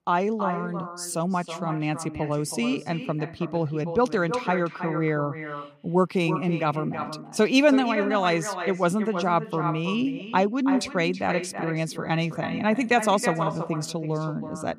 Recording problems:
echo of what is said; strong; throughout; 320 ms later, 9 dB below the speech

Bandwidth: 15.5 kHz